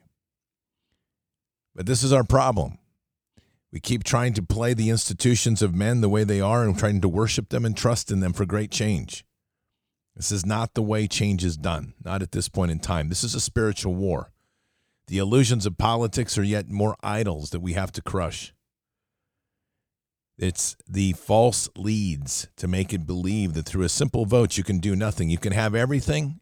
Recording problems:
none

